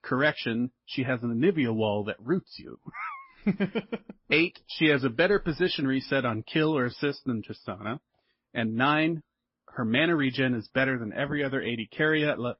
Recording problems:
garbled, watery; slightly; nothing above 5.5 kHz
high frequencies cut off; slight

